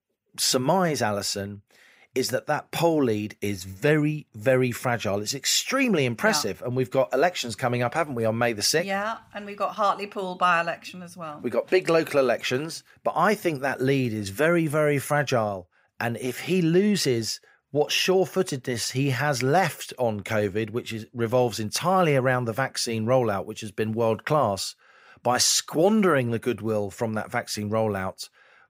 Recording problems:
none

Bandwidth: 15.5 kHz